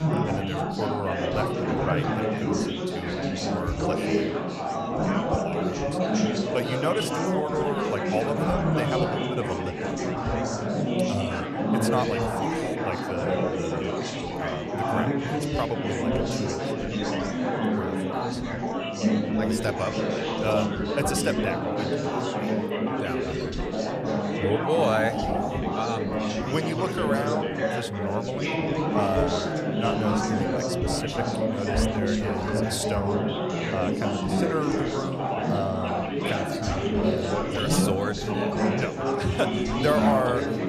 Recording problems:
chatter from many people; very loud; throughout; 5 dB above the speech

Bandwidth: 15 kHz